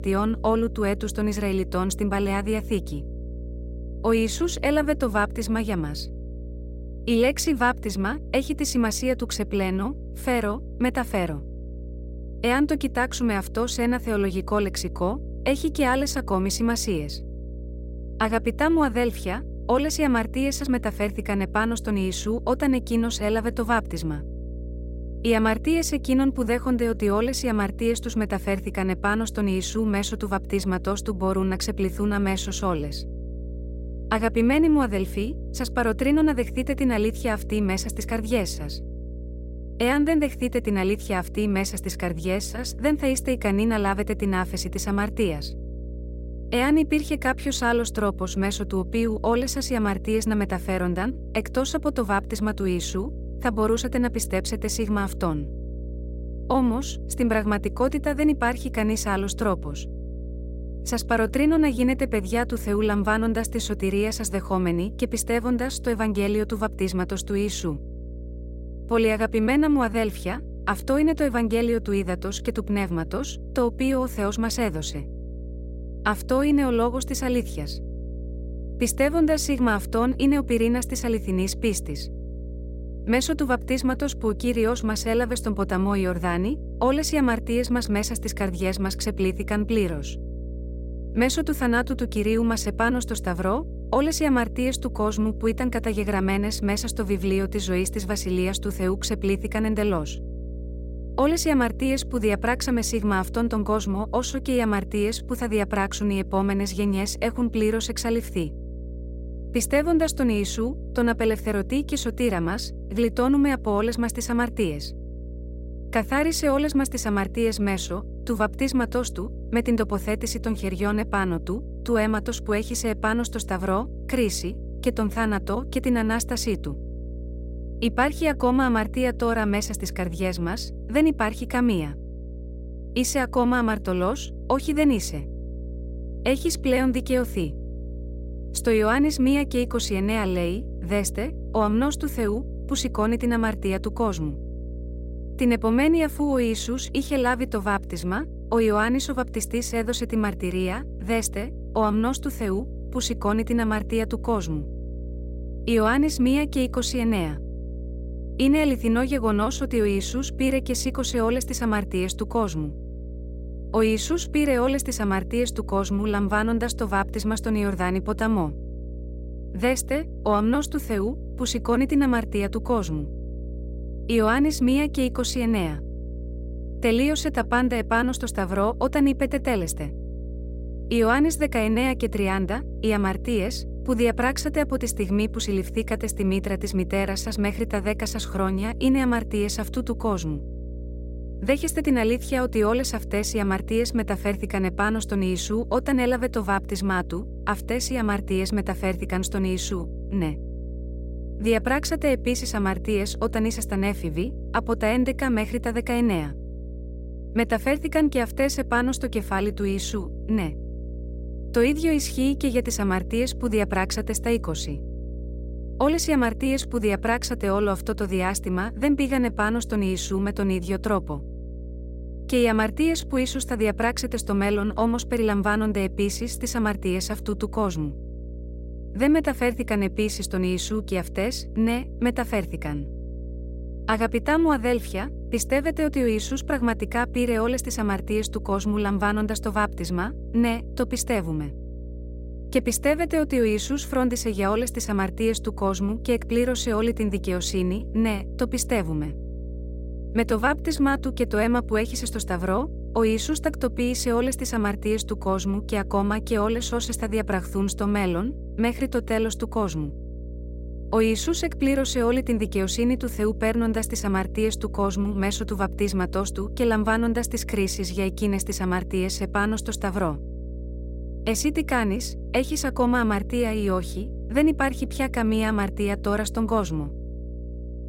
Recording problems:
electrical hum; noticeable; throughout; 60 Hz, 20 dB below the speech

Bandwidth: 16 kHz